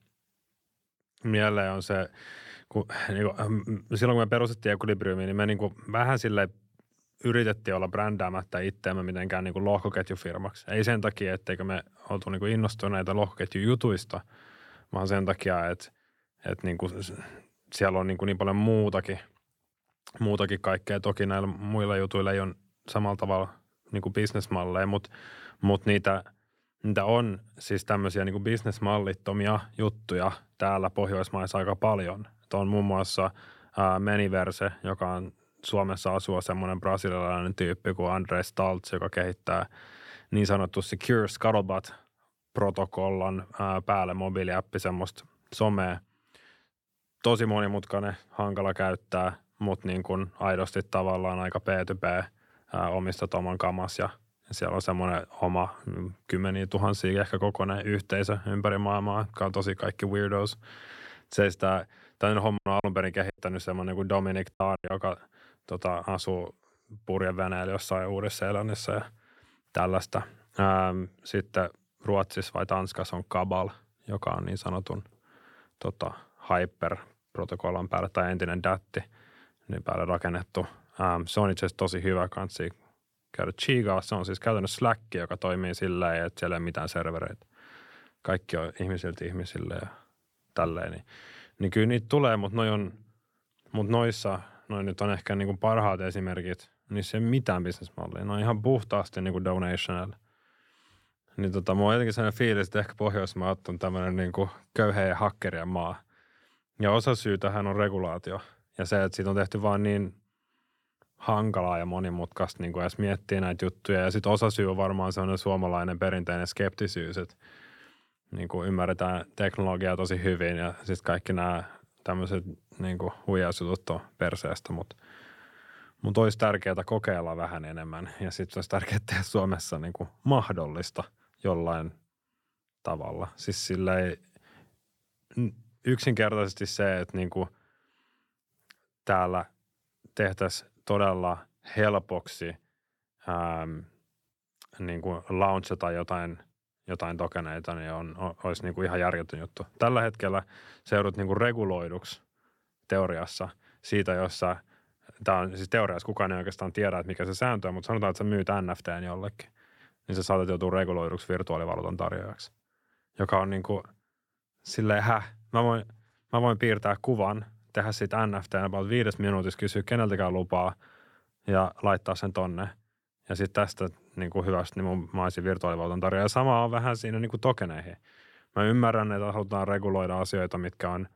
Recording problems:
choppy; very; from 1:03 to 1:05; 12% of the speech affected

